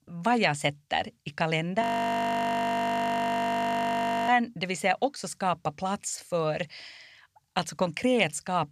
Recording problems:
audio freezing; at 2 s for 2.5 s

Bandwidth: 13.5 kHz